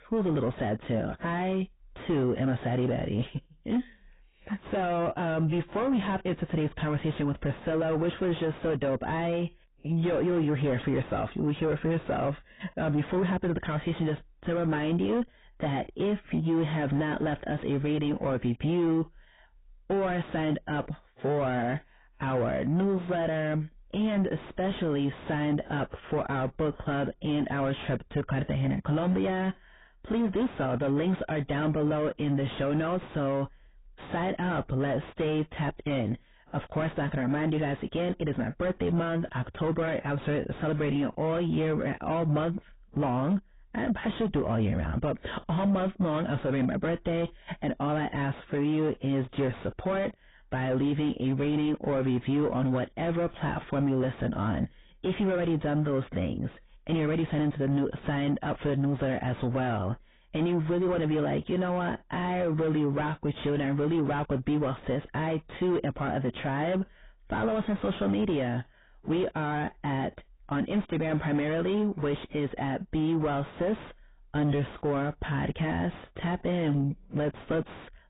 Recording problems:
distortion; heavy; 5 dB below the speech
garbled, watery; badly; nothing above 3.5 kHz

